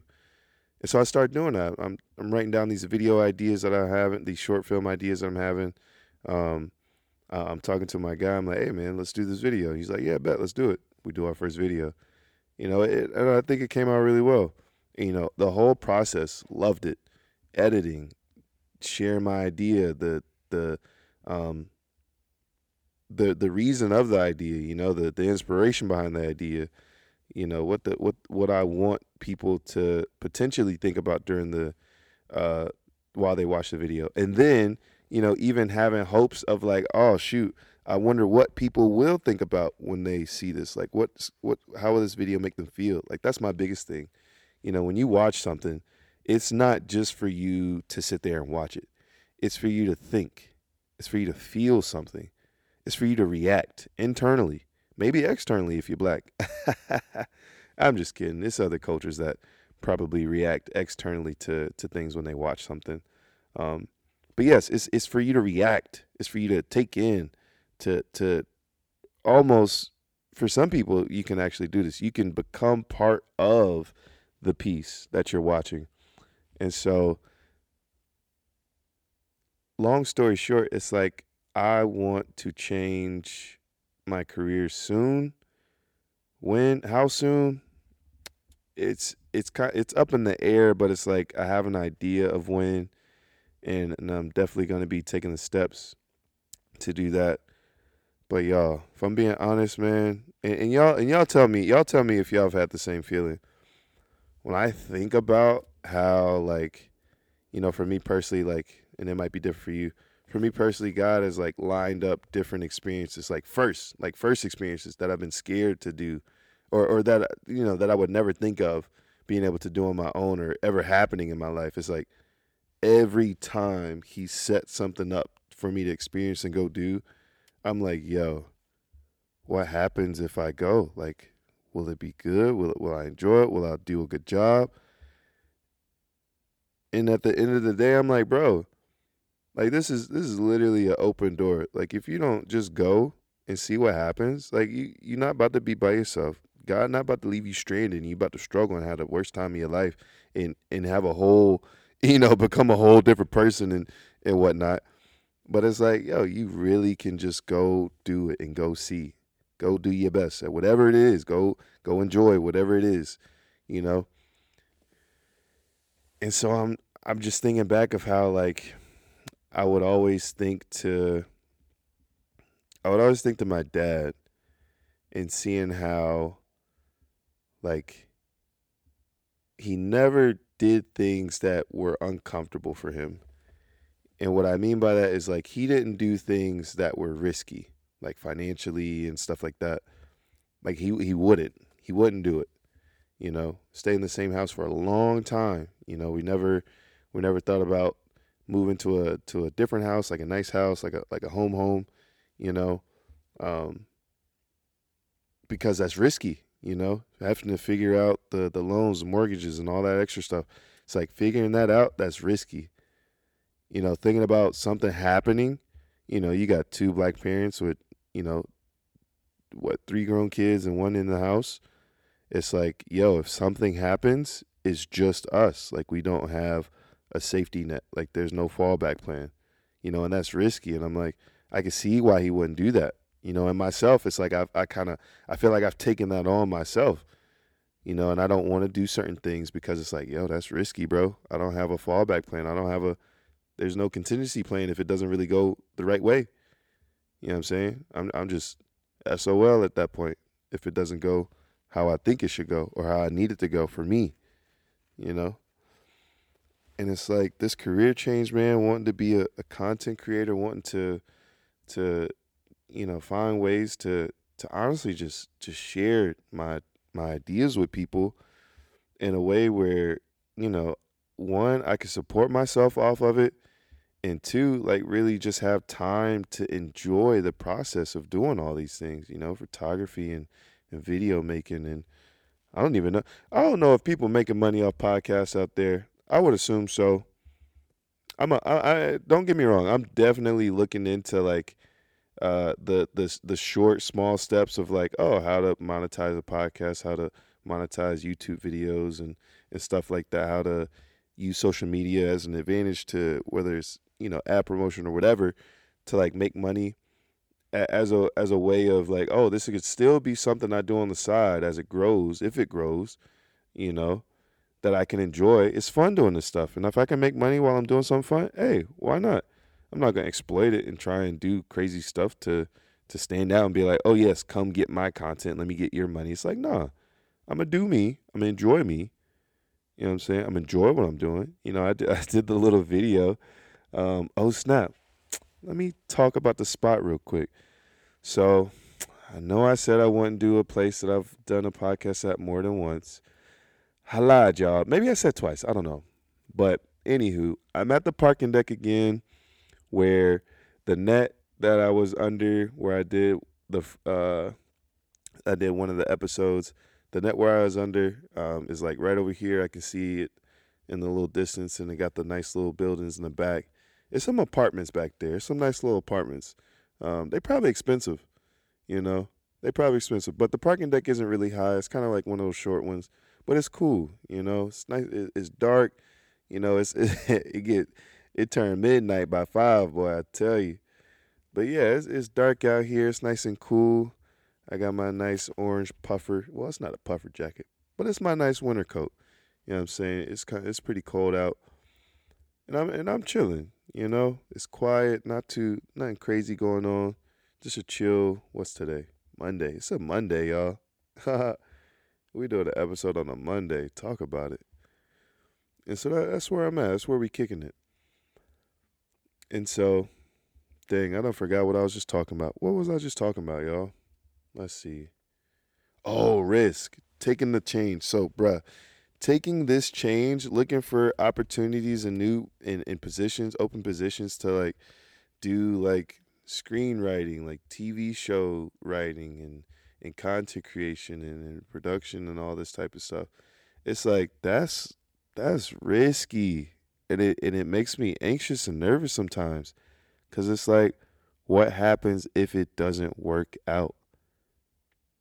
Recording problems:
none

